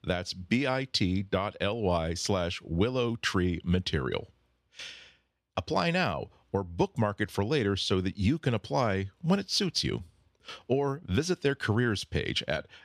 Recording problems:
none

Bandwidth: 13.5 kHz